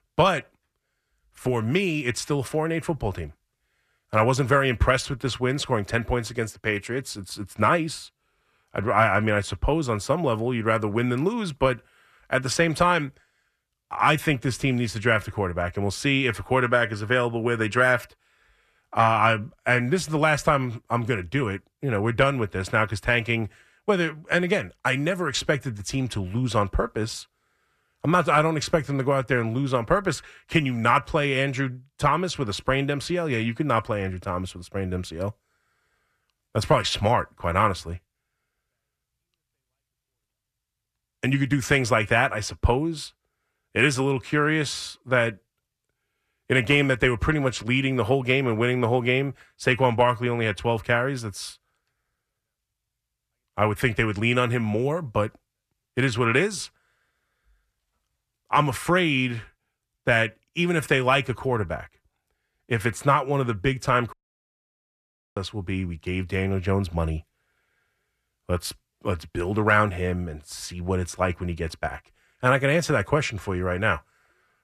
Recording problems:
audio cutting out; at 1:04 for 1 s

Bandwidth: 14.5 kHz